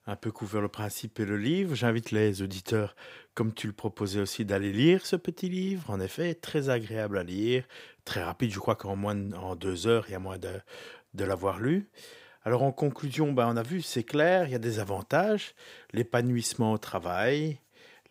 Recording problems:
none

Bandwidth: 15.5 kHz